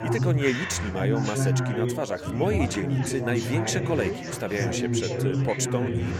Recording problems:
chatter from many people; very loud; throughout; 1 dB above the speech

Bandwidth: 17.5 kHz